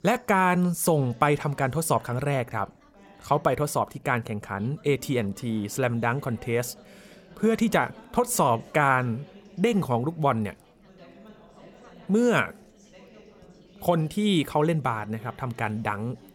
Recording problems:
background chatter; faint; throughout; 3 voices, 25 dB below the speech

